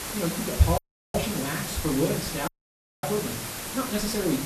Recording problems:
off-mic speech; far
wrong speed, natural pitch; too fast; 1.5 times normal speed
room echo; very slight; dies away in 0.4 s
hiss; loud; throughout; 4 dB below the speech
audio cutting out; at 1 s and at 2.5 s for 0.5 s

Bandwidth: 13.5 kHz